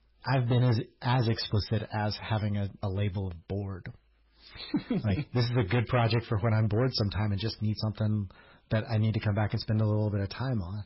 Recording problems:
garbled, watery; badly; nothing above 5.5 kHz
distortion; slight; 7% of the sound clipped

